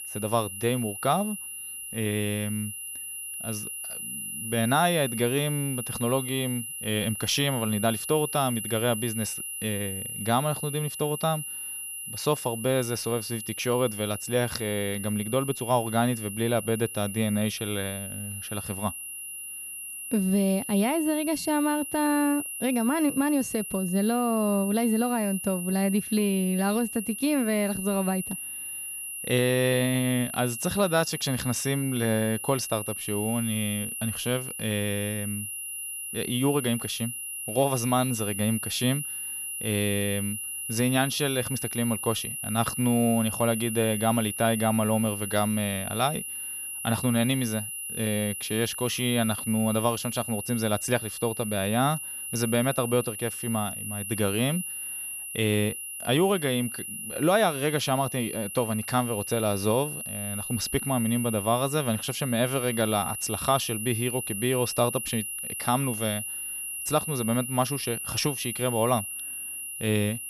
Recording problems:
high-pitched whine; loud; throughout; 11 kHz, 6 dB below the speech

